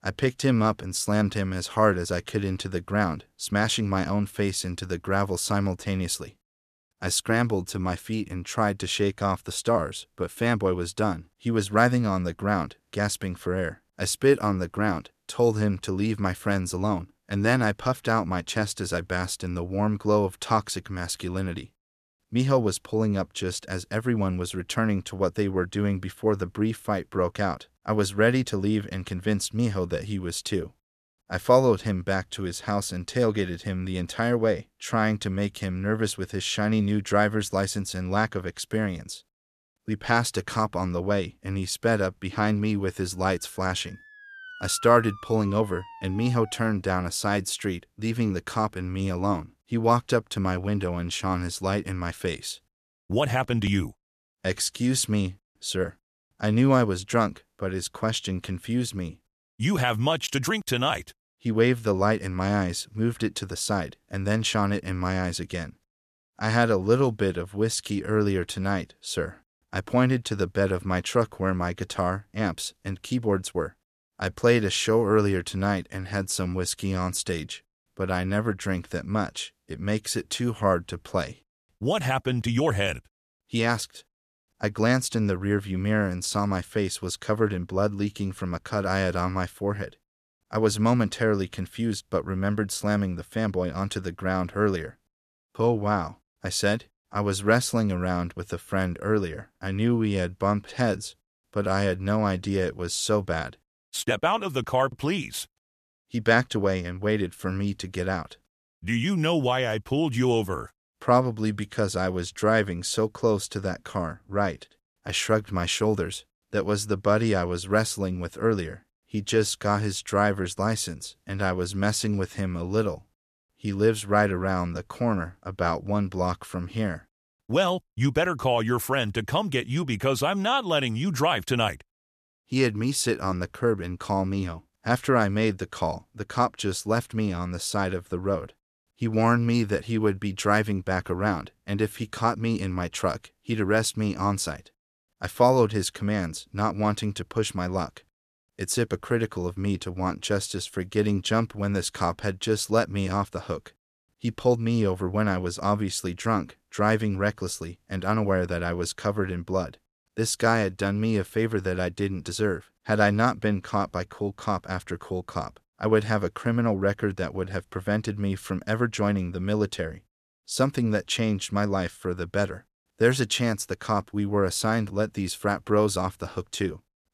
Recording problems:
none

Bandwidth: 14 kHz